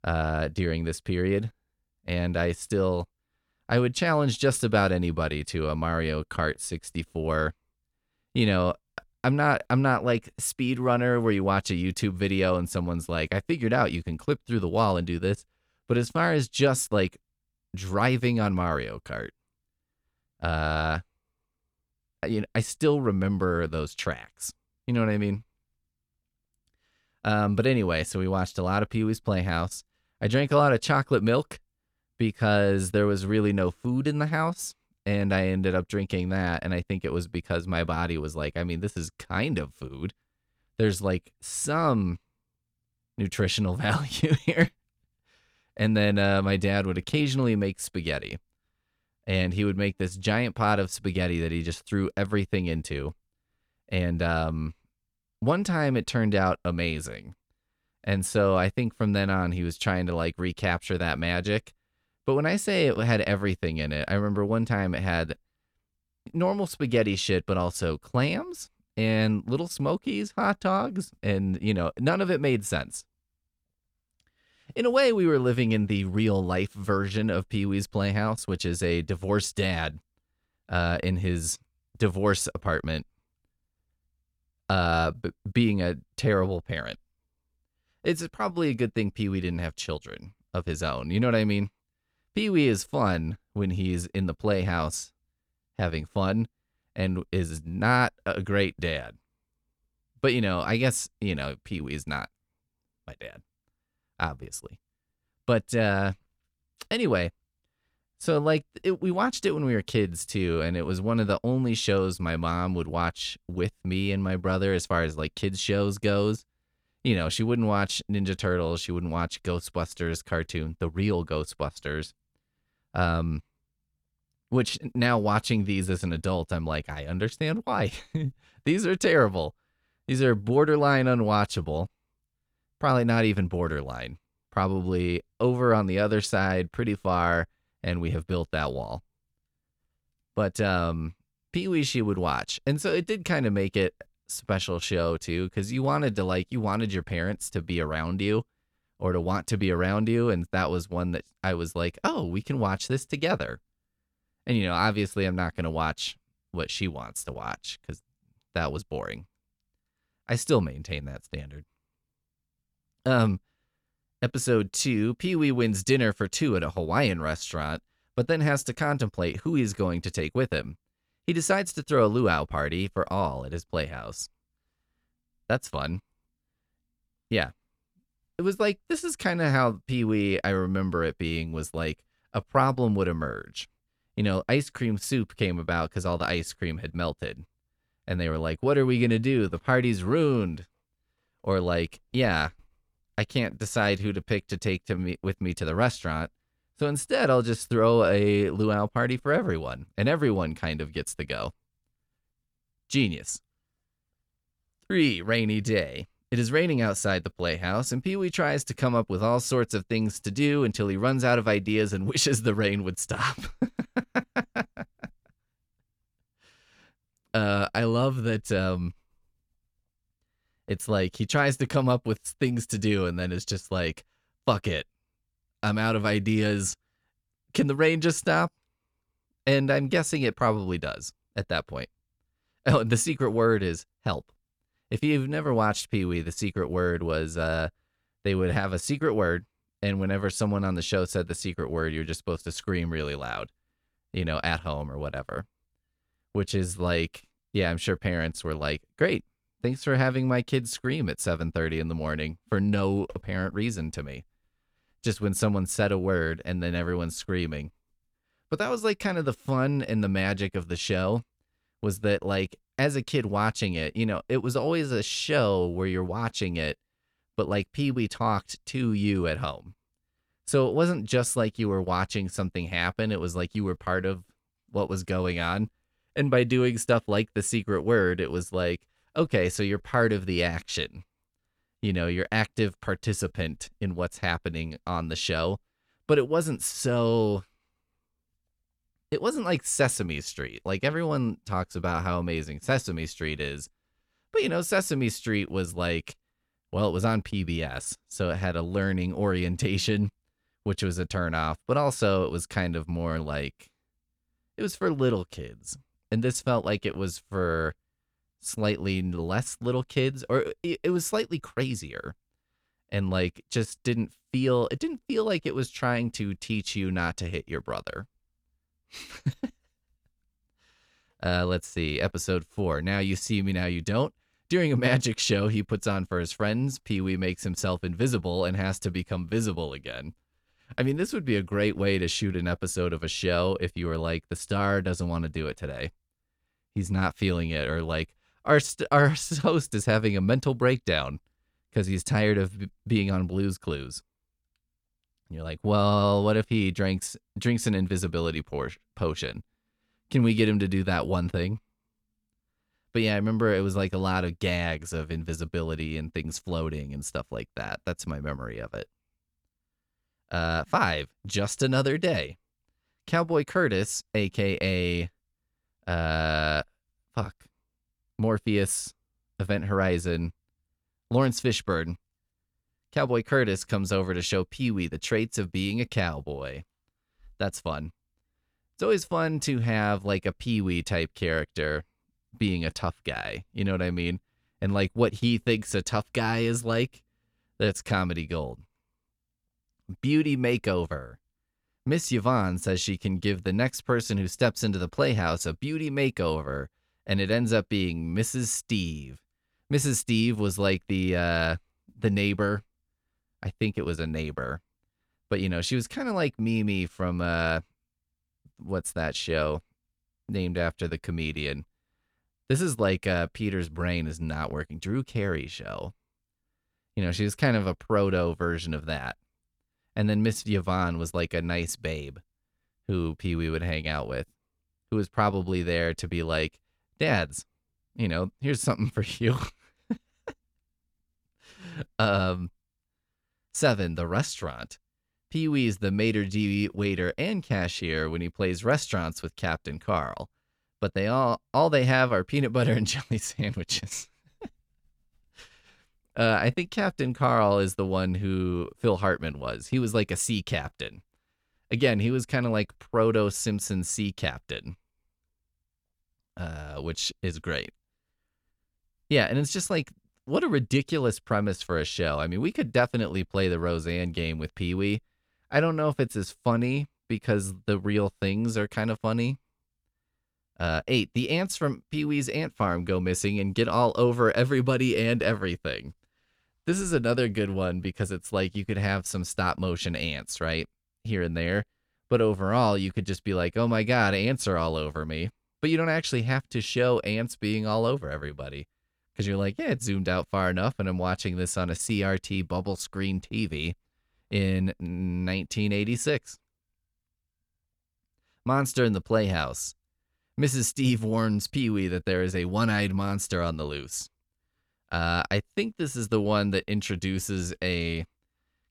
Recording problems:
none

